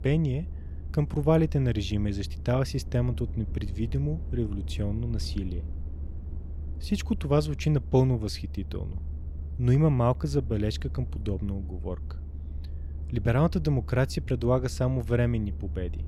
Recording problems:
low rumble; faint; throughout; 20 dB below the speech

